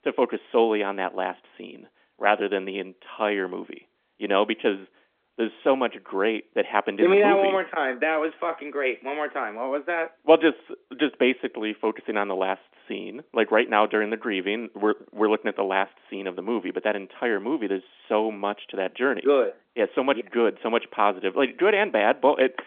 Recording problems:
phone-call audio; nothing above 3.5 kHz

